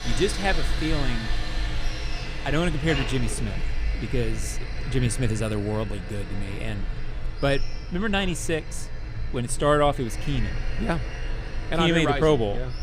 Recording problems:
machinery noise; loud; throughout; 7 dB below the speech

